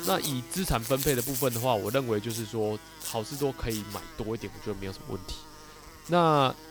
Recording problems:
electrical hum; noticeable; throughout; 50 Hz, 10 dB below the speech

